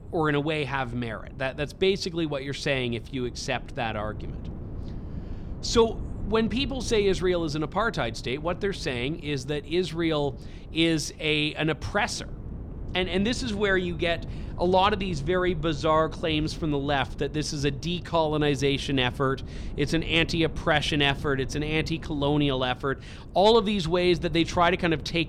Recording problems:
wind noise on the microphone; occasional gusts; 20 dB below the speech

